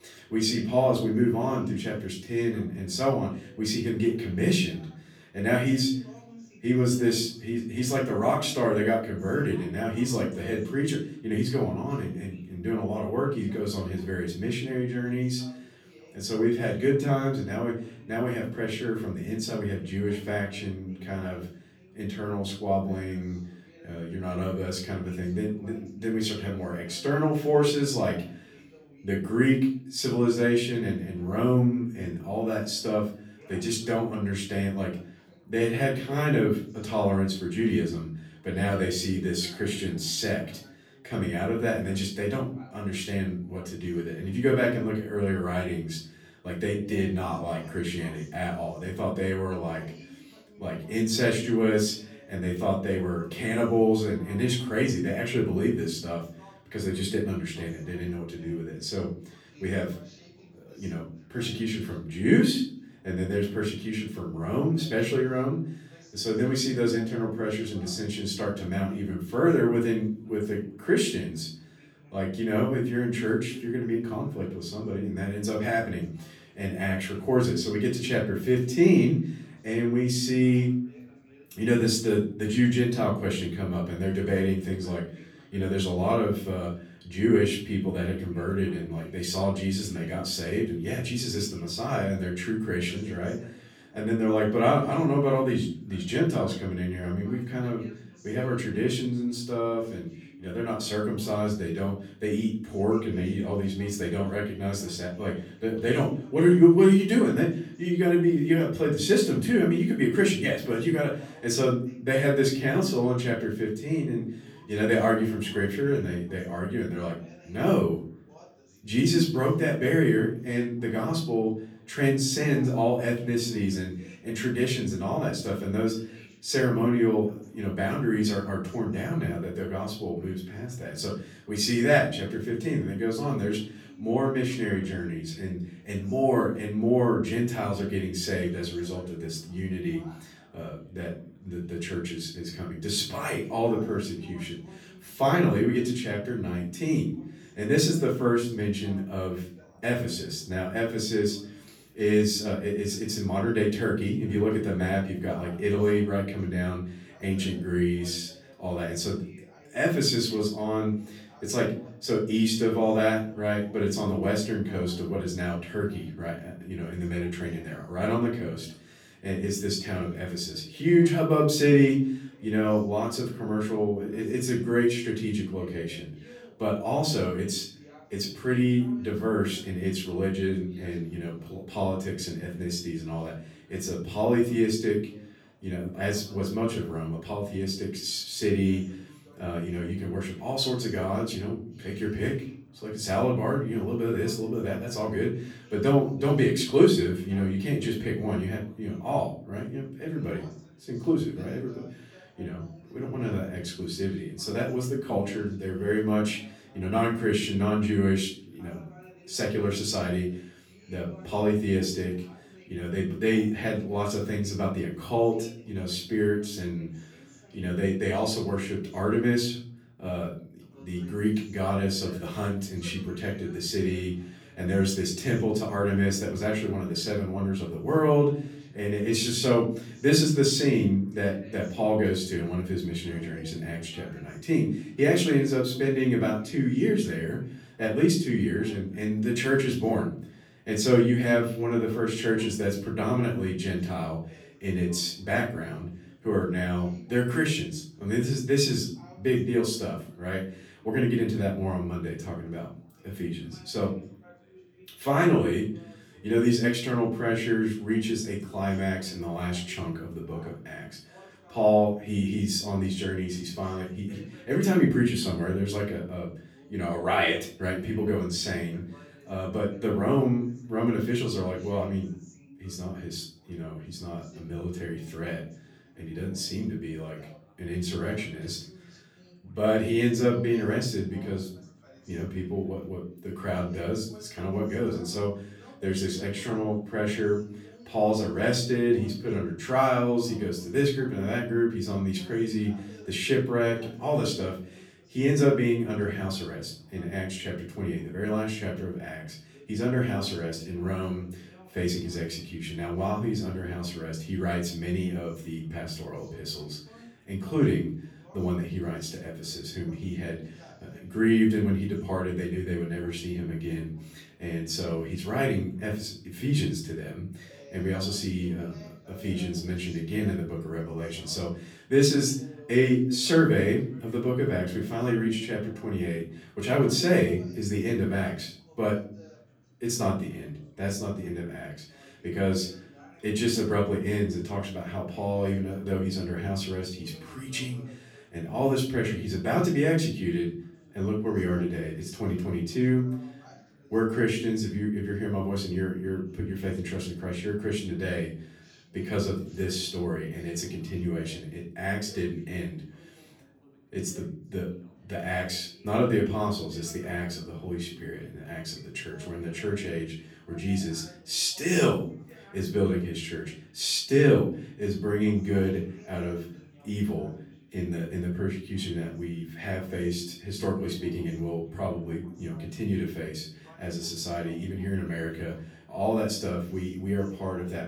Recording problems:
off-mic speech; far
room echo; slight; dies away in 0.5 s
background chatter; faint; throughout; 2 voices, 25 dB below the speech

